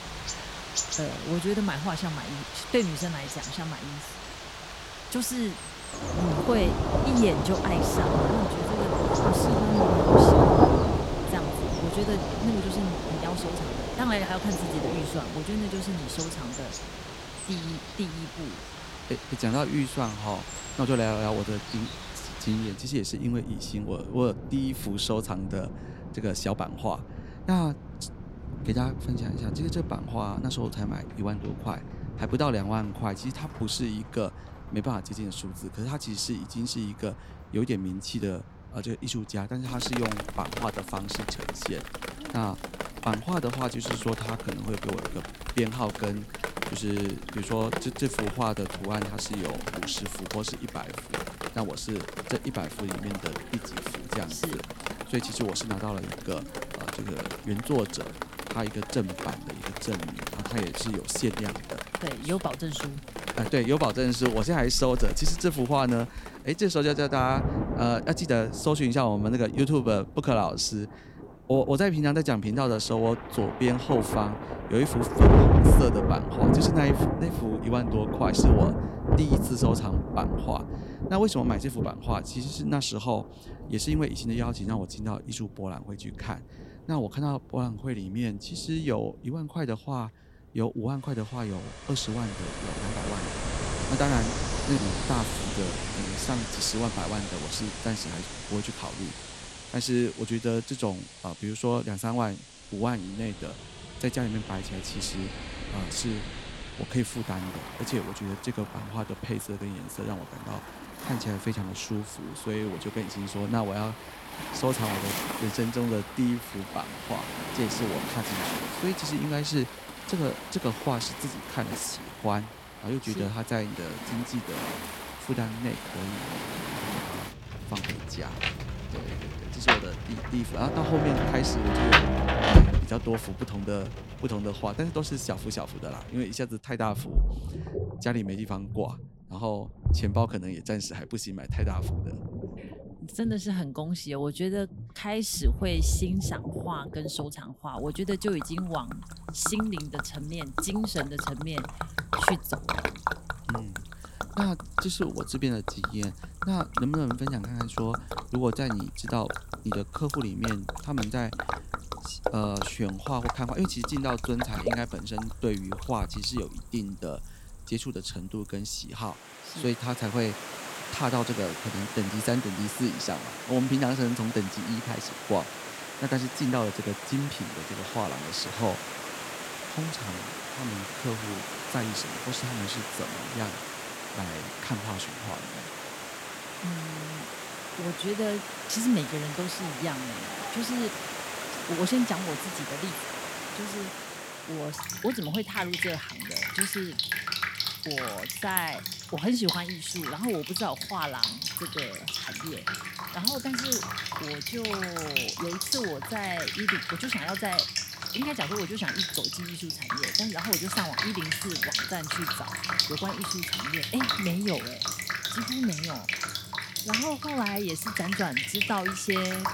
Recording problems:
rain or running water; loud; throughout; as loud as the speech

